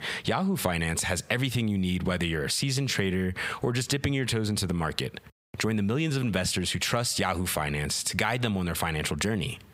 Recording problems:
squashed, flat; heavily

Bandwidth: 15.5 kHz